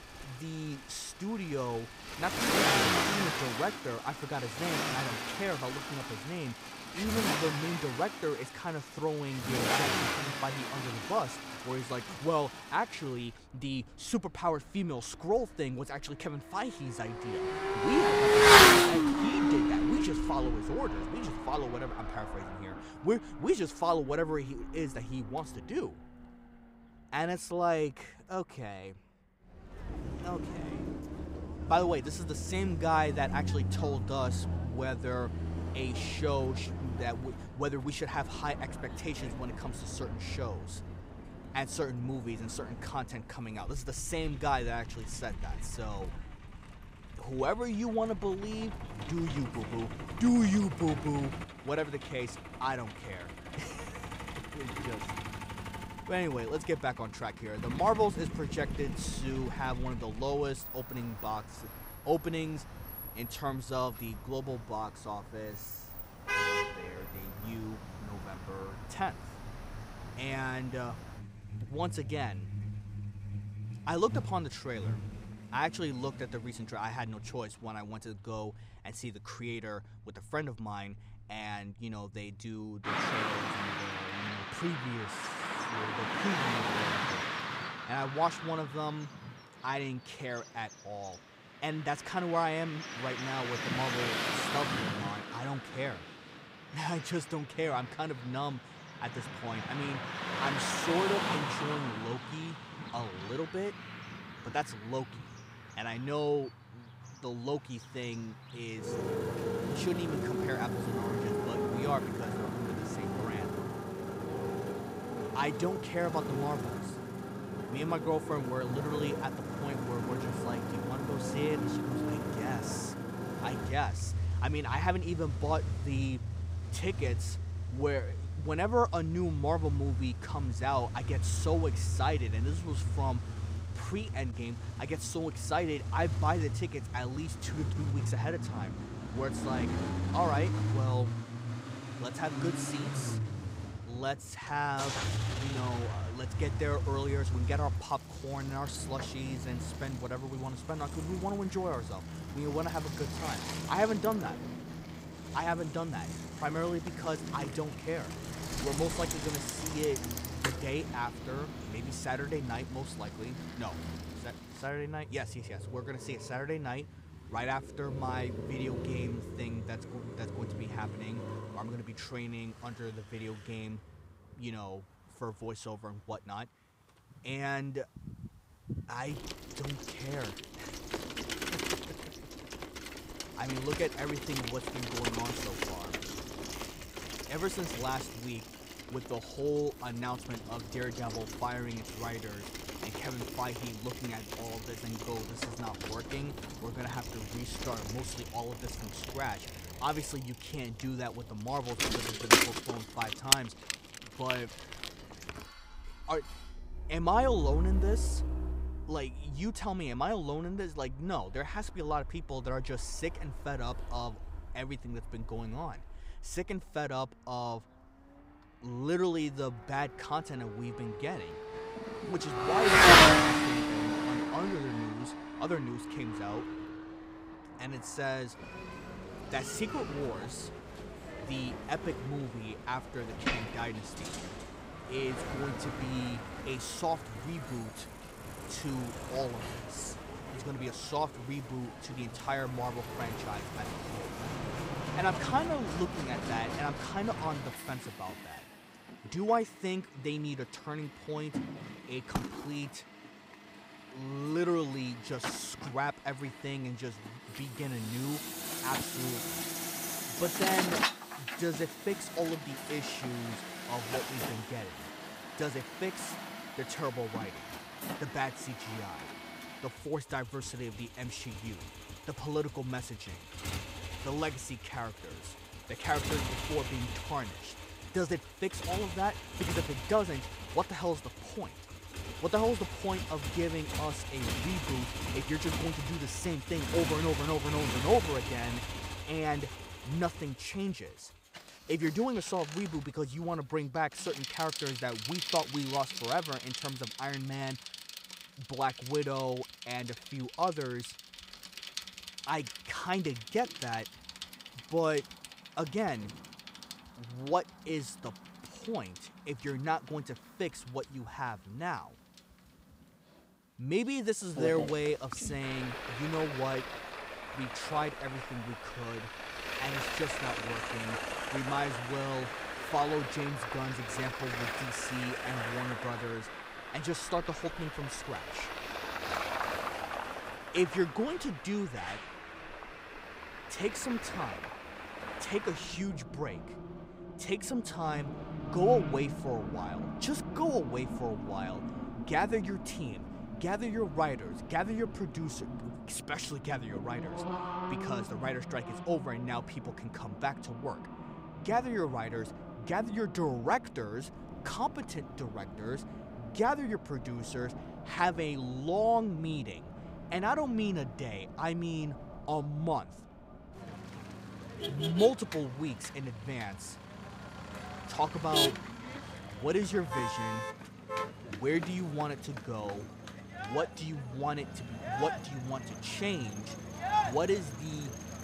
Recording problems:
traffic noise; very loud; throughout; 1 dB above the speech
clattering dishes; faint; from 3:24 to 3:27; peak 15 dB below the speech

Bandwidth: 15.5 kHz